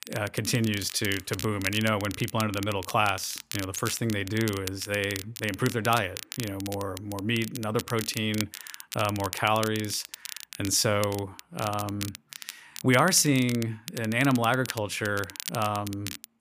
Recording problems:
crackle, like an old record; noticeable; 10 dB below the speech

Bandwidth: 15 kHz